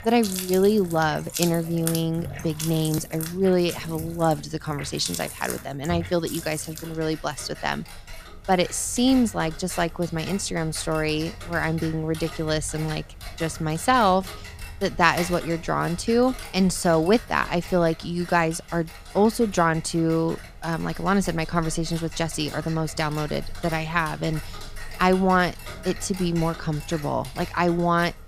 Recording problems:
household noises; noticeable; throughout; 15 dB below the speech

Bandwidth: 14.5 kHz